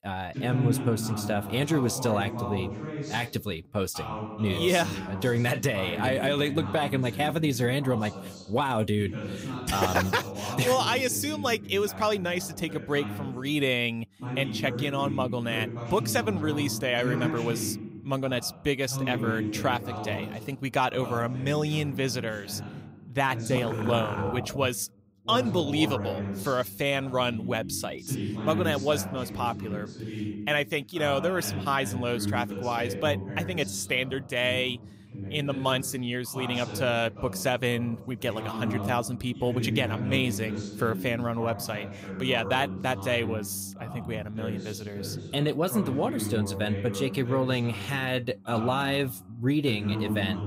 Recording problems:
voice in the background; loud; throughout; 7 dB below the speech

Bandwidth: 15.5 kHz